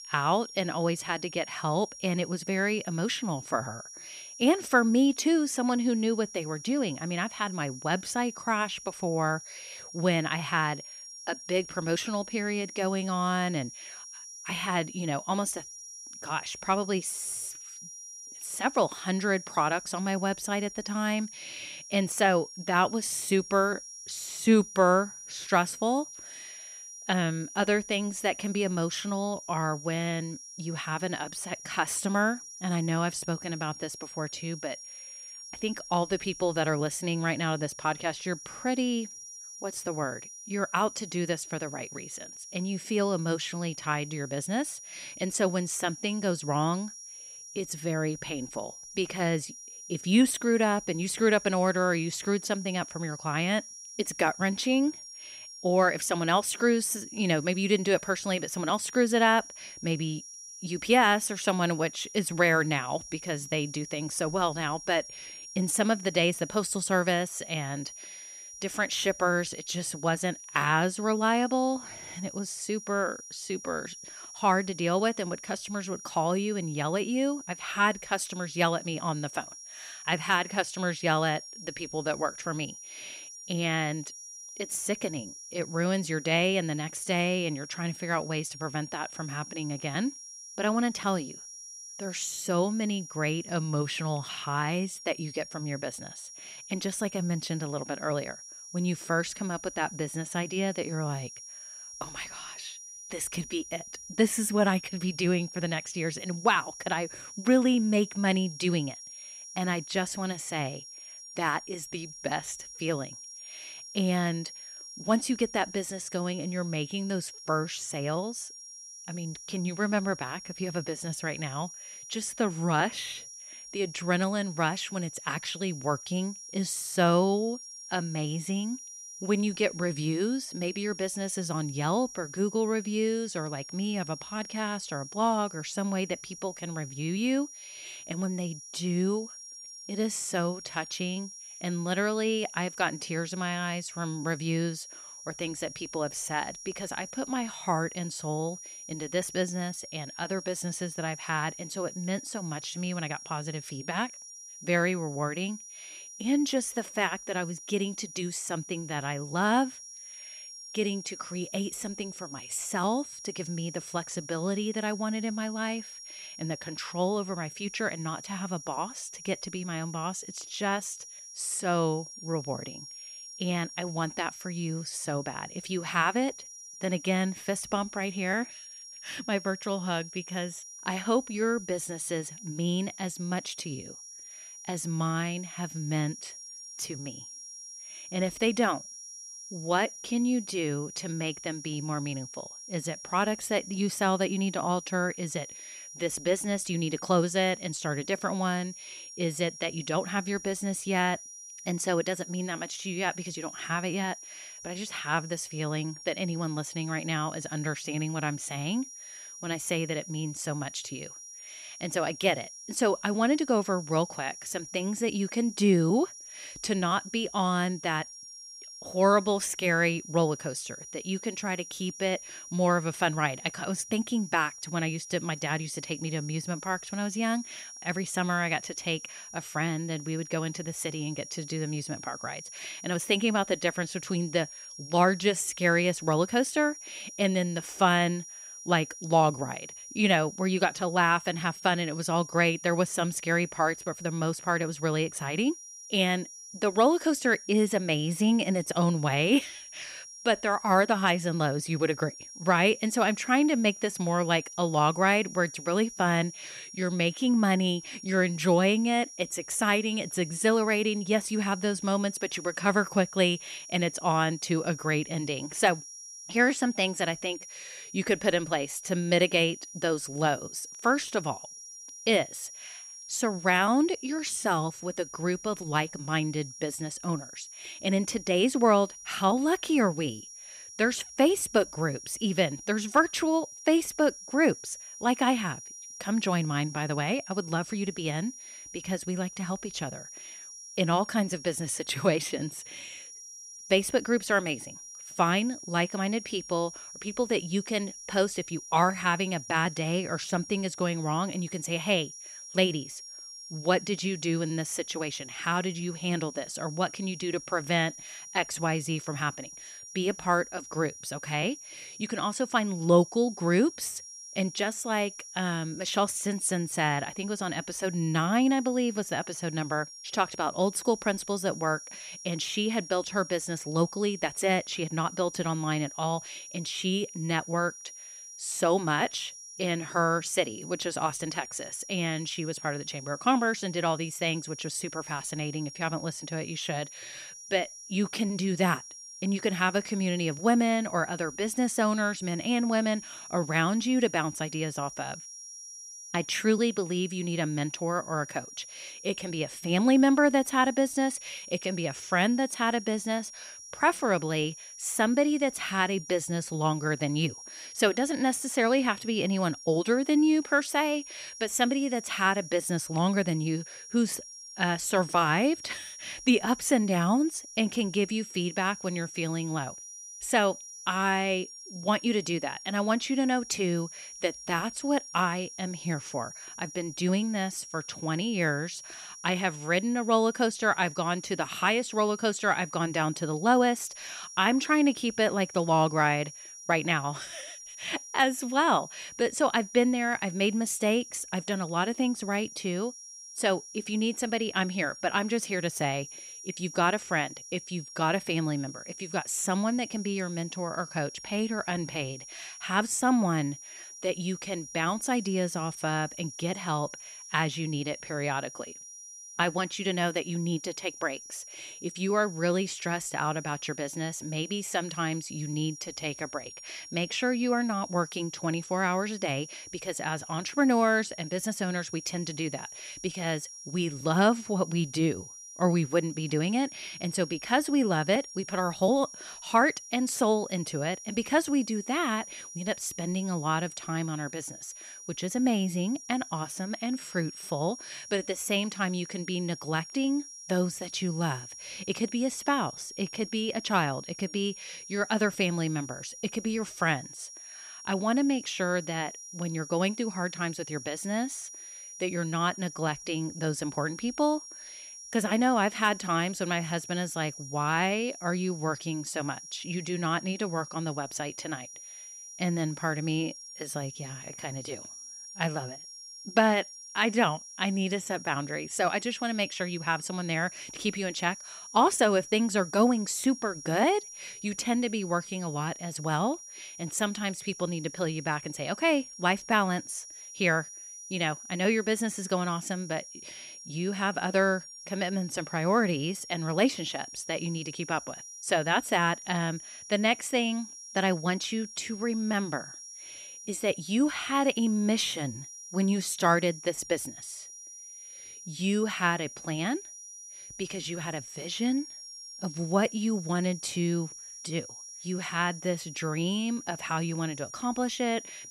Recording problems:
high-pitched whine; noticeable; throughout; 5.5 kHz, 15 dB below the speech

